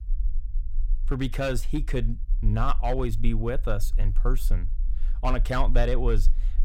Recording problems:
low rumble; faint; throughout; 25 dB below the speech

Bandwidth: 16 kHz